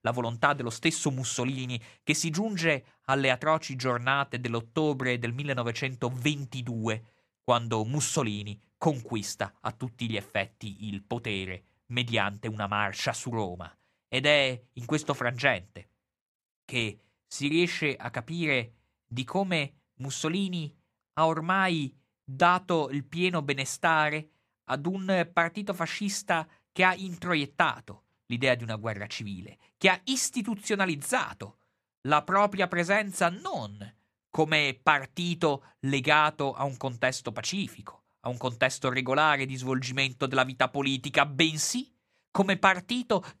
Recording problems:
none

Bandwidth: 14.5 kHz